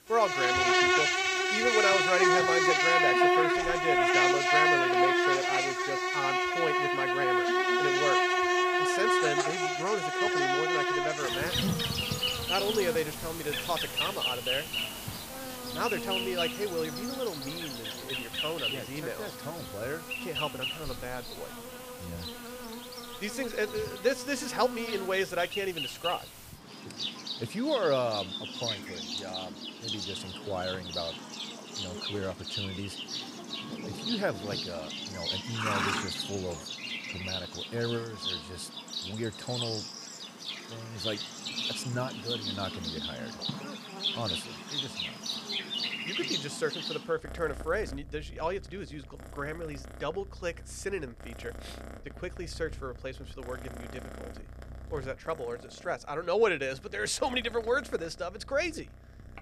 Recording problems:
animal sounds; very loud; throughout; 4 dB above the speech

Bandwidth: 15 kHz